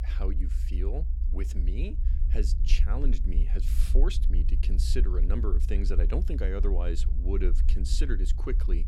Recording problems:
low rumble; loud; throughout; 10 dB below the speech

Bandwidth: 18 kHz